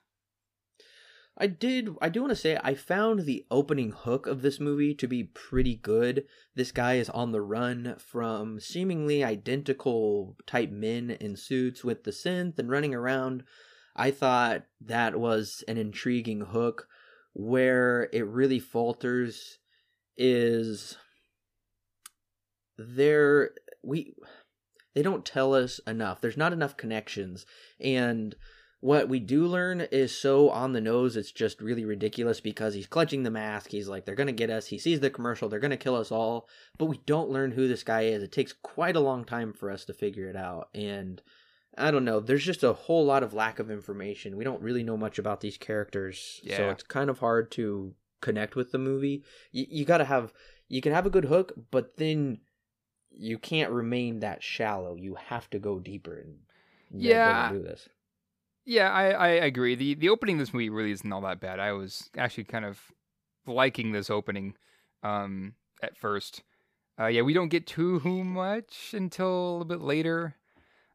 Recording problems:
none

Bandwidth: 15 kHz